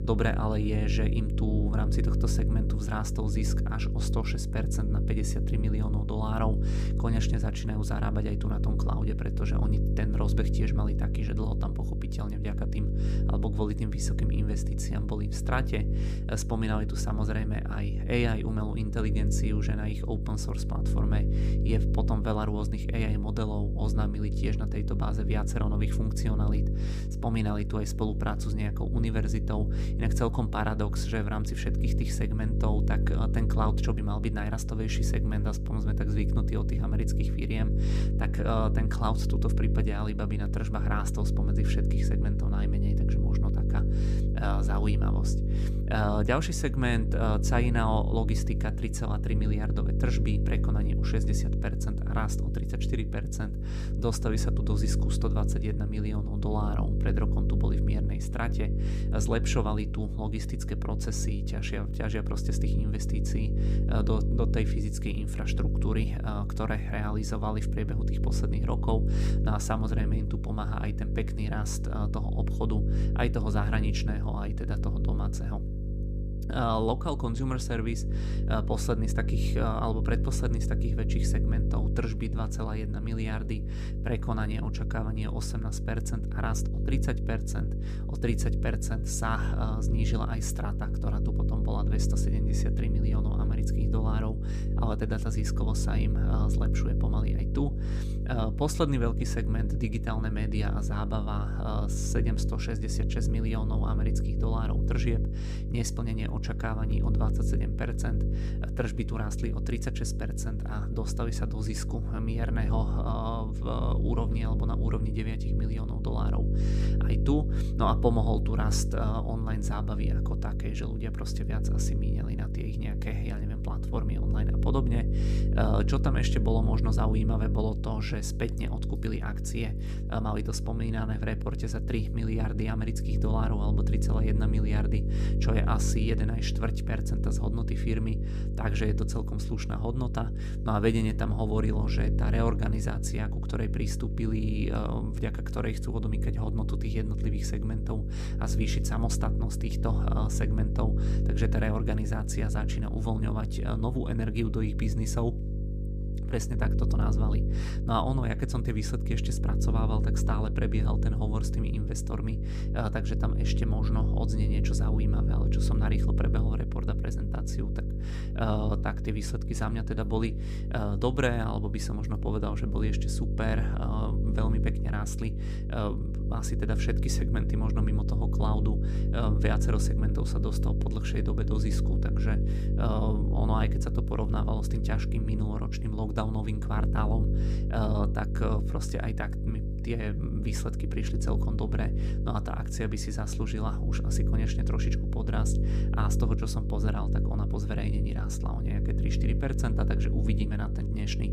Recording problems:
electrical hum; loud; throughout; 50 Hz, 6 dB below the speech

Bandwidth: 15 kHz